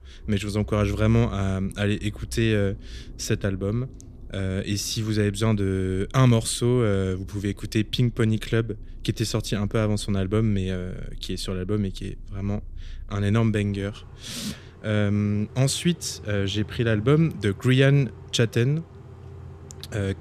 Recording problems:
traffic noise; noticeable; throughout; 20 dB below the speech

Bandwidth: 14.5 kHz